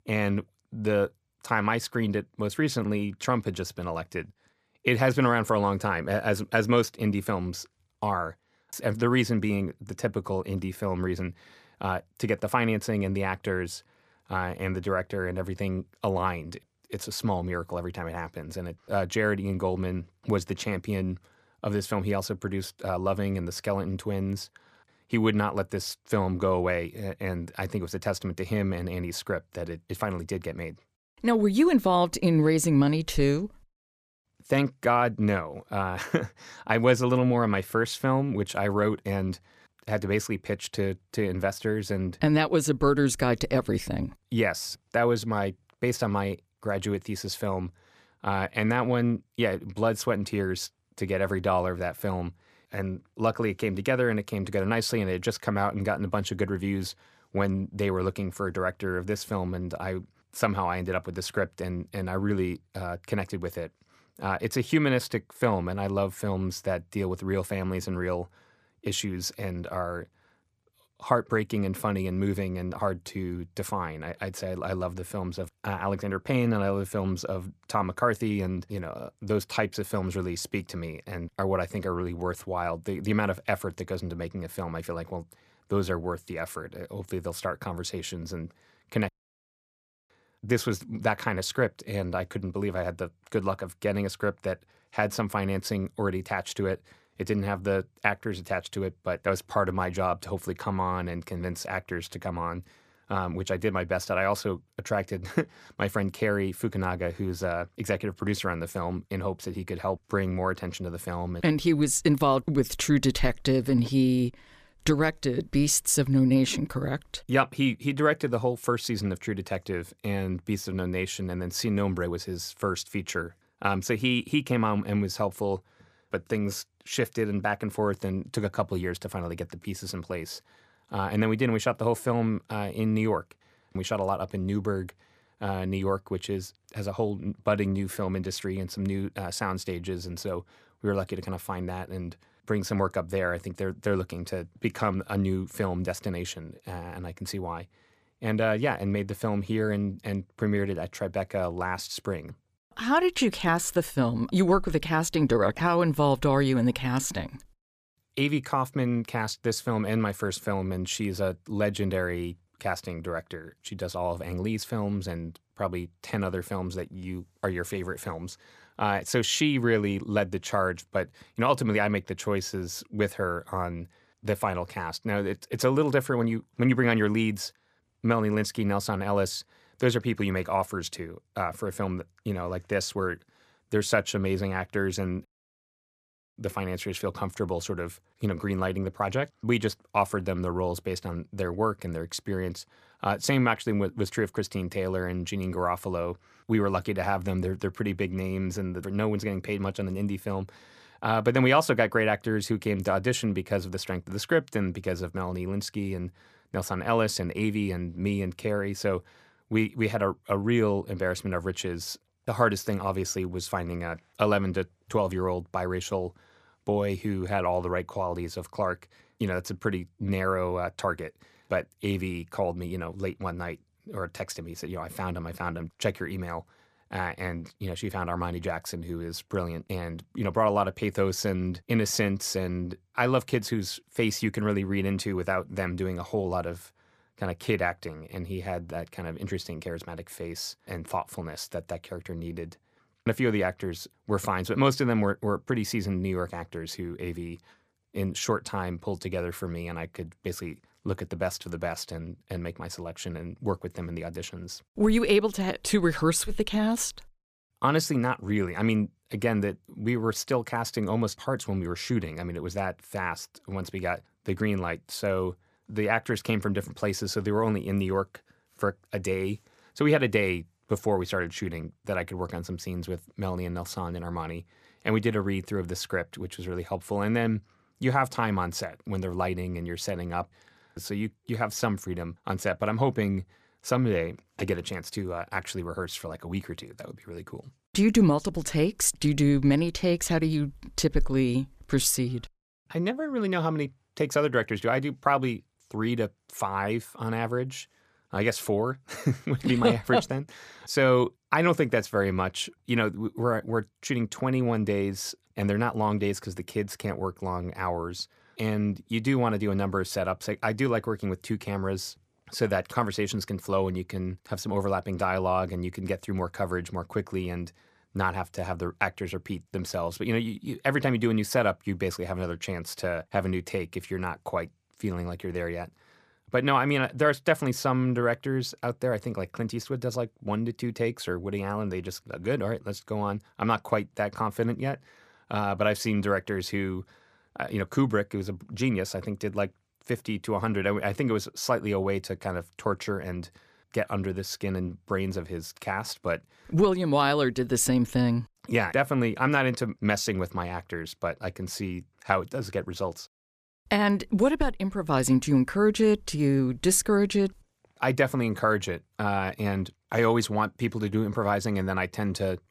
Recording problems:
audio cutting out; at 1:29 for 1 s and at 3:05 for 1 s

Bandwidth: 14.5 kHz